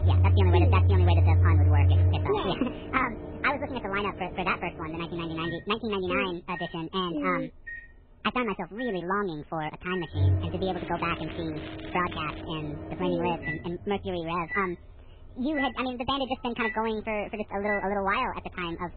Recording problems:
garbled, watery; badly
high frequencies cut off; severe; nothing above 4 kHz
wrong speed and pitch; too fast and too high; 1.6 times normal speed
household noises; very loud; throughout; 2 dB above the speech
crackling; noticeable; from 11 to 12 s; 15 dB below the speech

